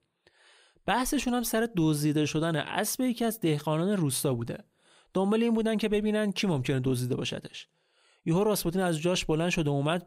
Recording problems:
none

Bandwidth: 15.5 kHz